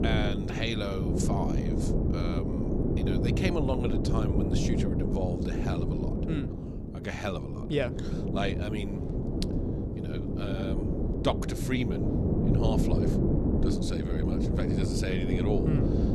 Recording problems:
wind noise on the microphone; heavy; as loud as the speech

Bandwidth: 14.5 kHz